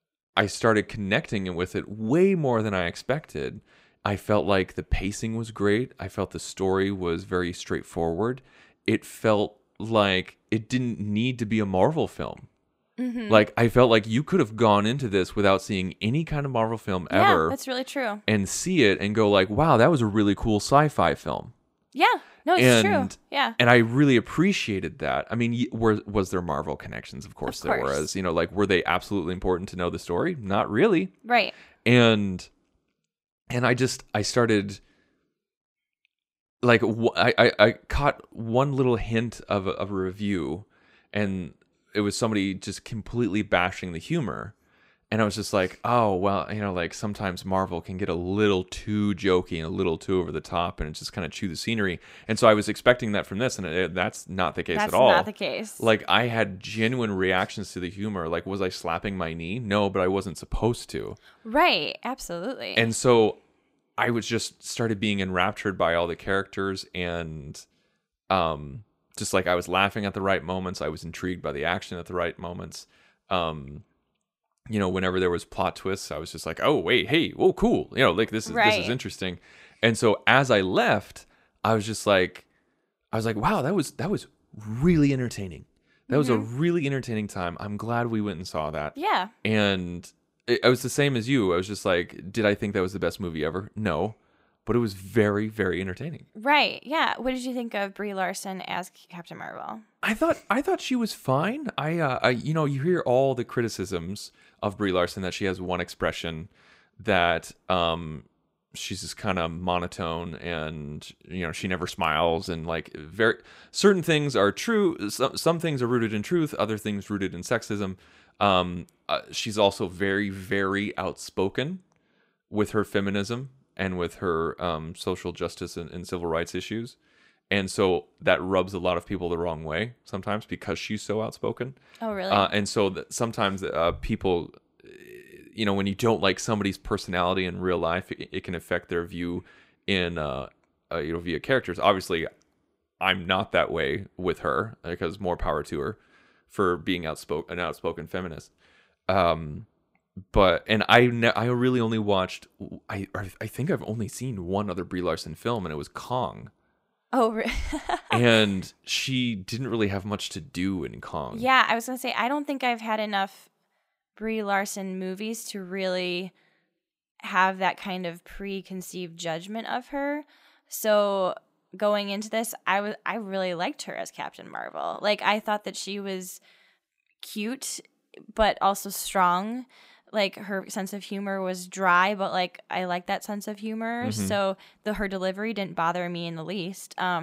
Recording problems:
abrupt cut into speech; at the end

